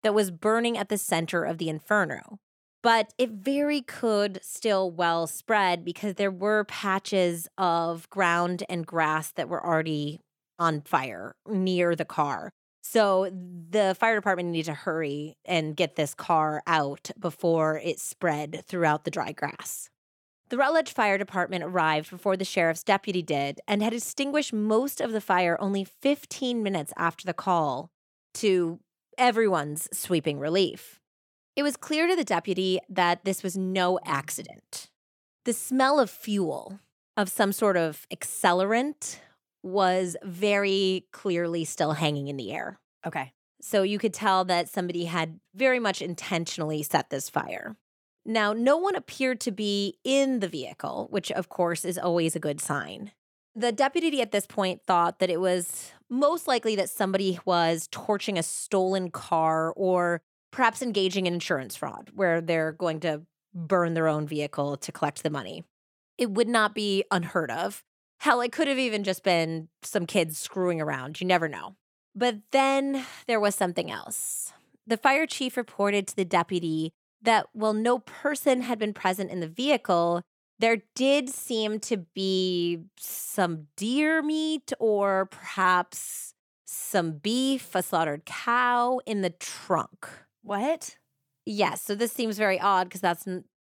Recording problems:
none

